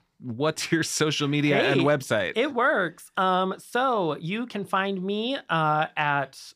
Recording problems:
none

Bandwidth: 15 kHz